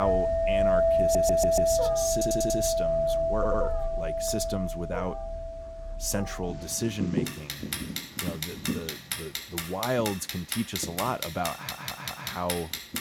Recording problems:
household noises; very loud; throughout; 4 dB above the speech
animal sounds; loud; throughout; 6 dB below the speech
abrupt cut into speech; at the start
audio stuttering; 4 times, first at 1 s

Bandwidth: 17.5 kHz